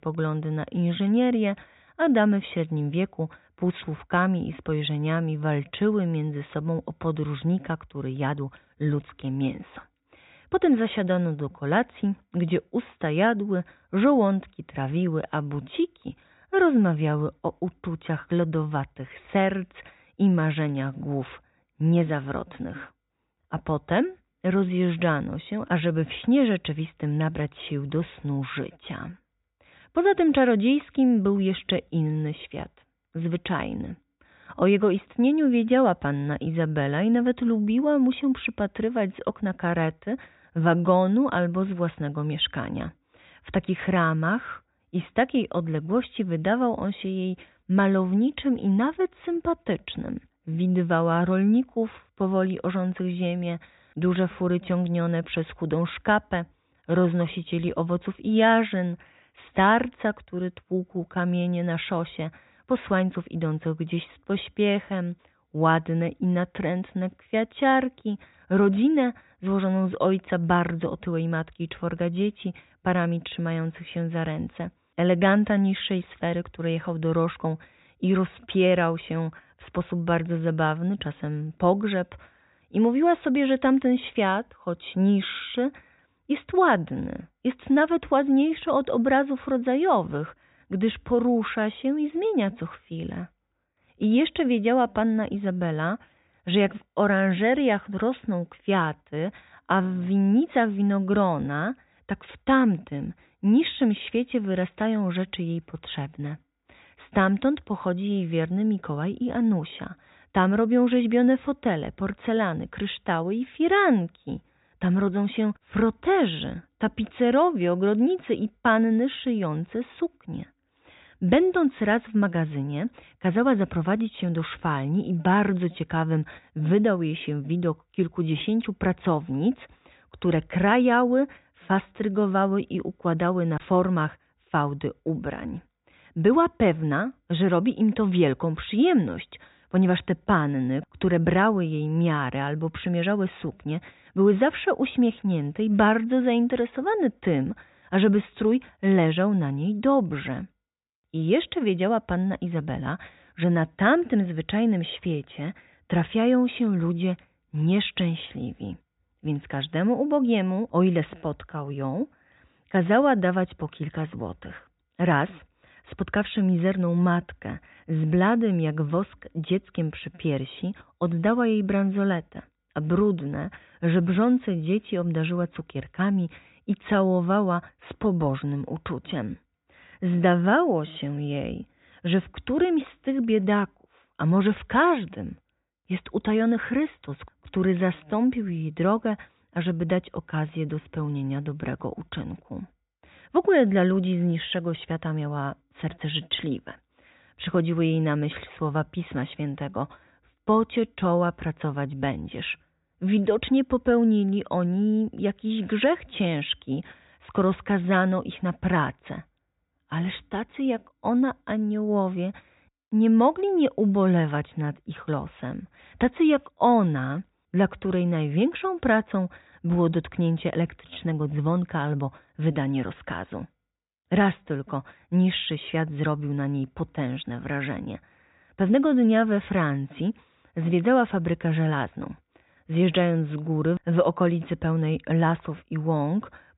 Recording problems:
high frequencies cut off; severe; nothing above 4 kHz

